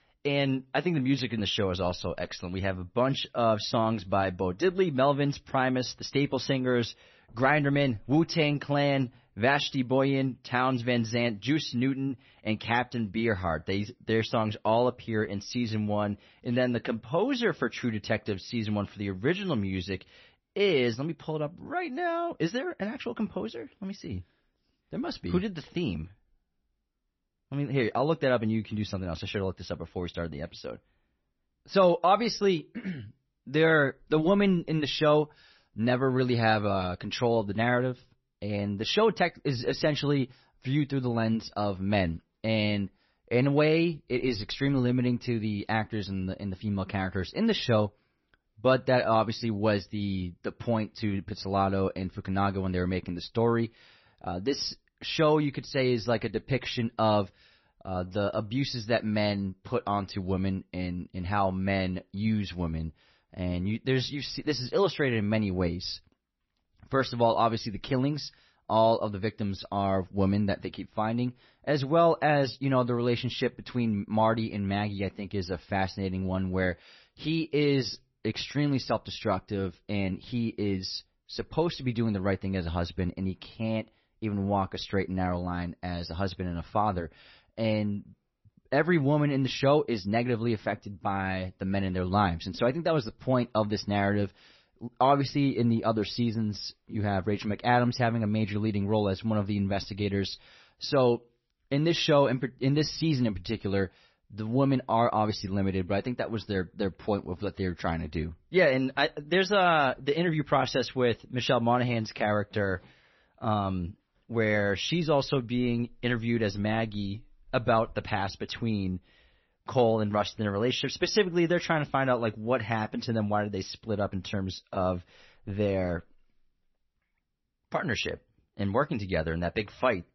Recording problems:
garbled, watery; slightly; nothing above 6 kHz

